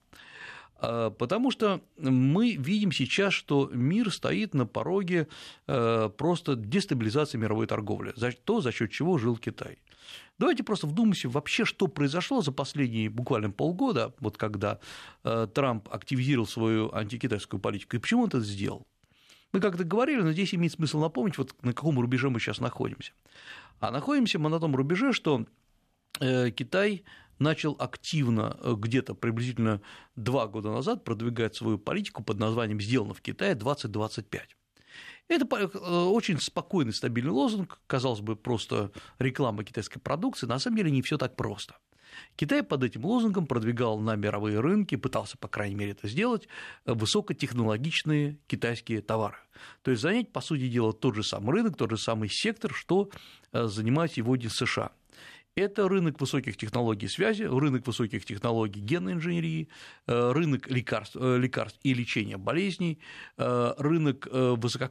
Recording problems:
none

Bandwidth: 13.5 kHz